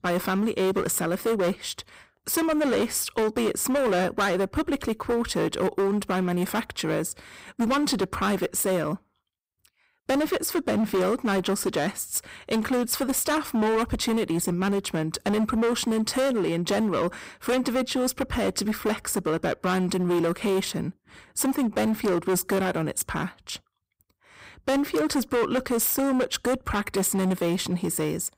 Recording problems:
distortion; heavy; 17% of the sound clipped

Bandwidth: 15.5 kHz